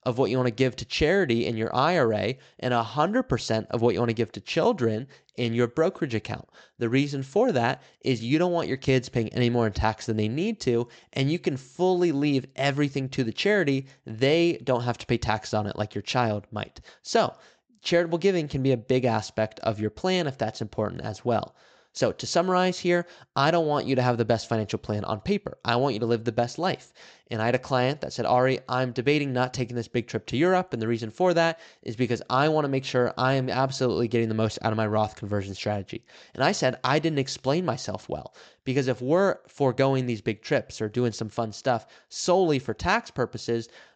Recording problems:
high frequencies cut off; noticeable; nothing above 8 kHz

